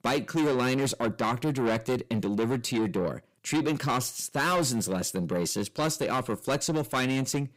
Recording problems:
distortion; heavy; 7 dB below the speech

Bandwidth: 15.5 kHz